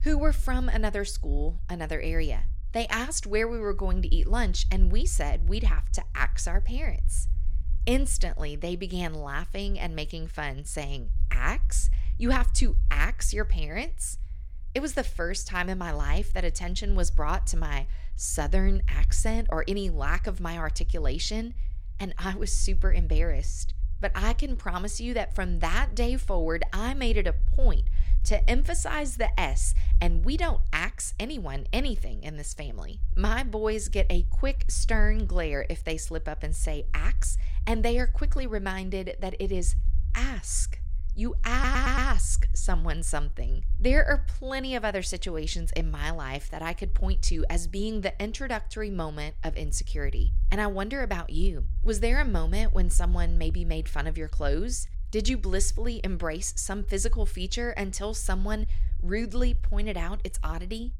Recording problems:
low rumble; faint; throughout; 25 dB below the speech
audio stuttering; at 42 s

